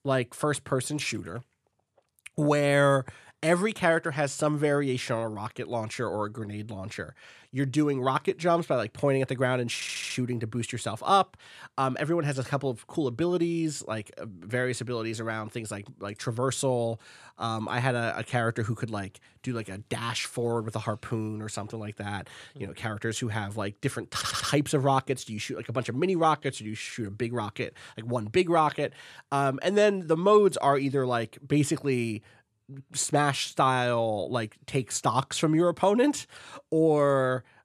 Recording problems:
audio stuttering; at 10 s and at 24 s

